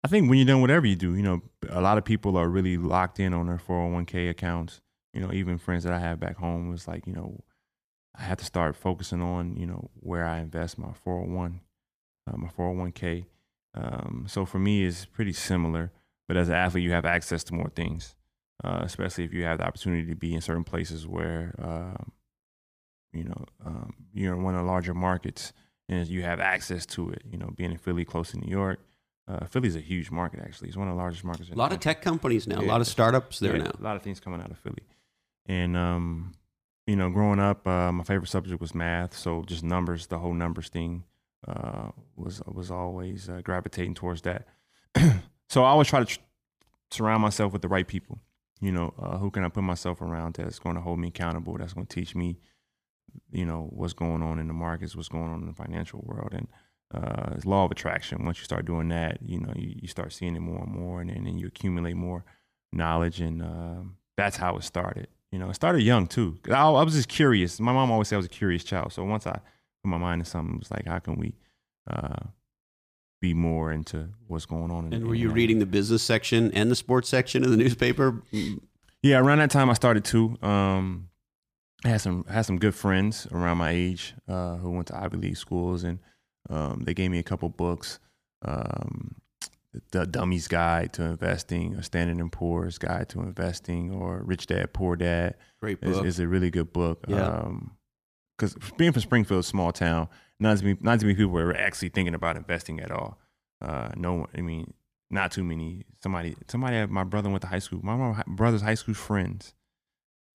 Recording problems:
none

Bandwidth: 15 kHz